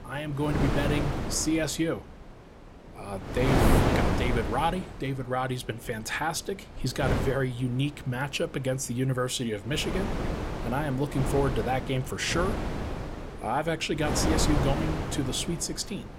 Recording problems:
wind noise on the microphone; heavy; 2 dB below the speech

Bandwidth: 16 kHz